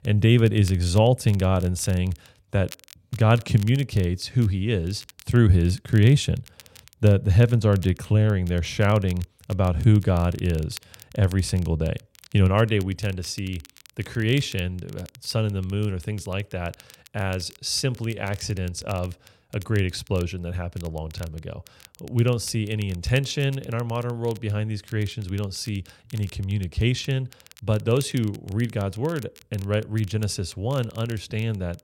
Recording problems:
crackle, like an old record; faint; 25 dB below the speech

